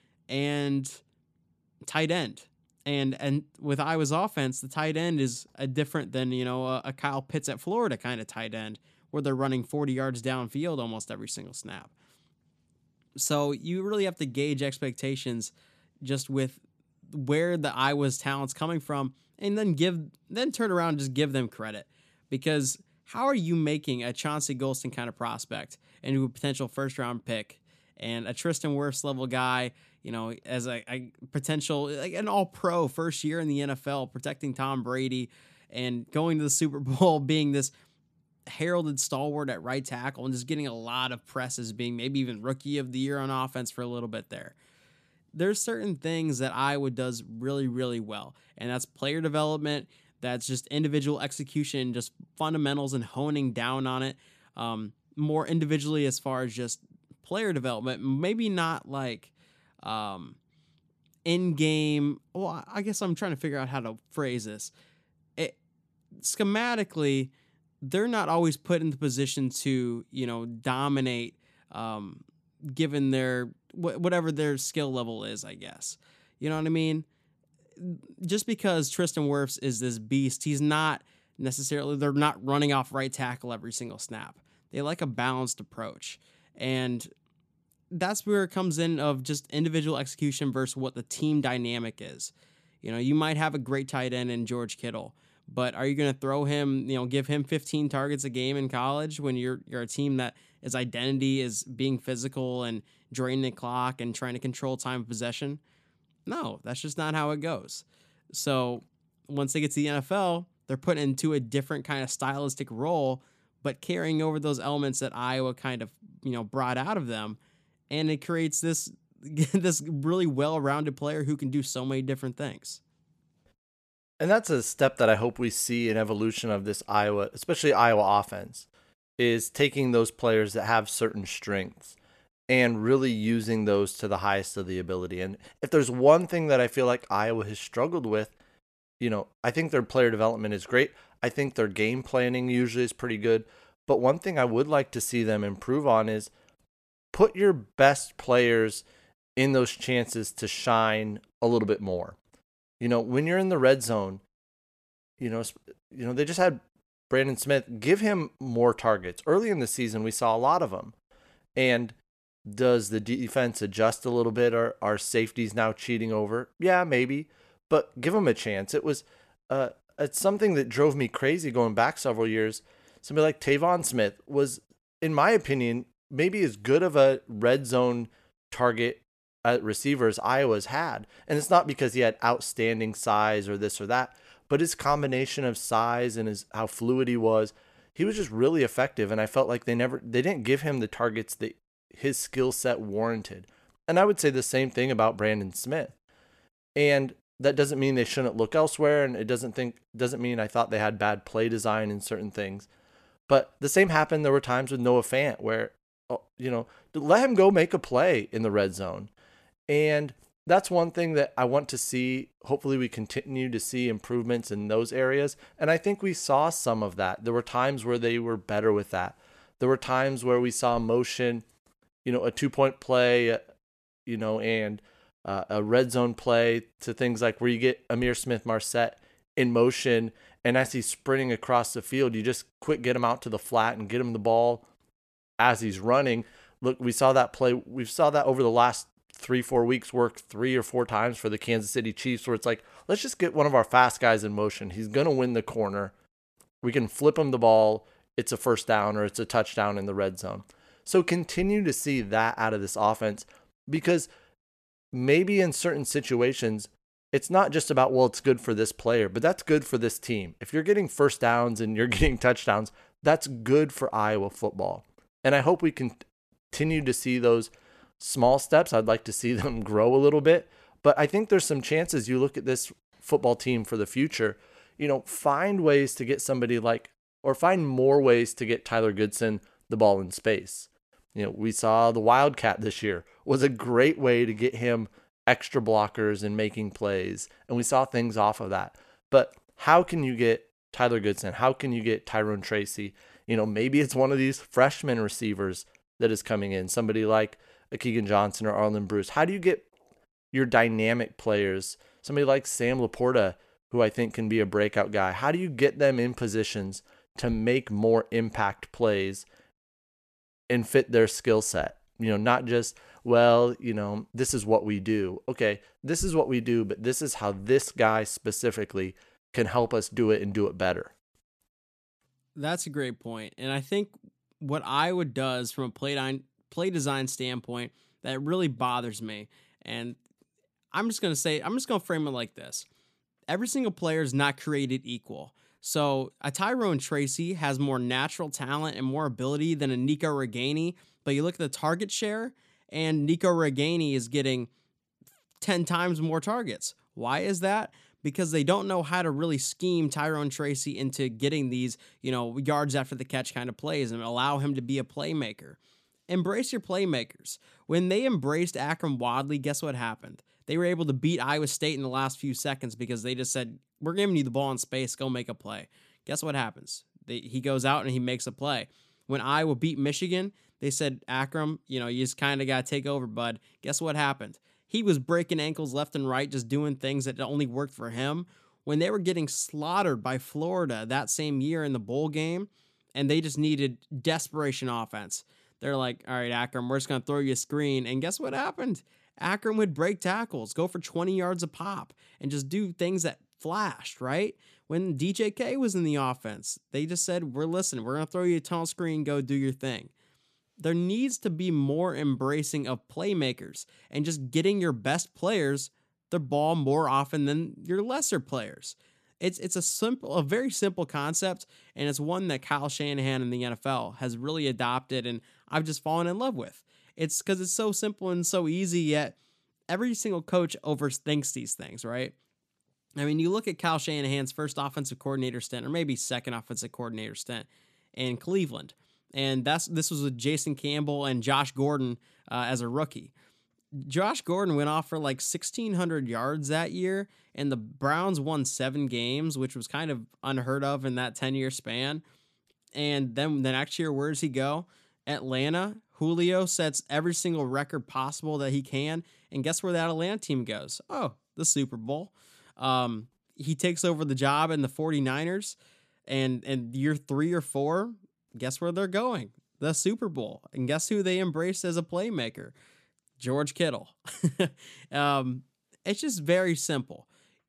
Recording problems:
none

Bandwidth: 14 kHz